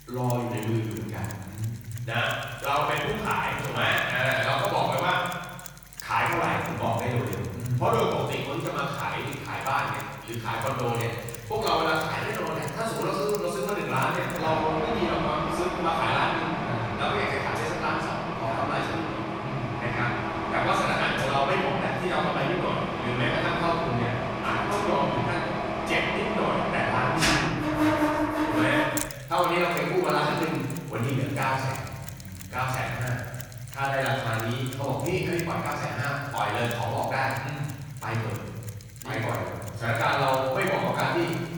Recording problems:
room echo; strong; dies away in 1.5 s
off-mic speech; far
machinery noise; loud; throughout; 5 dB below the speech

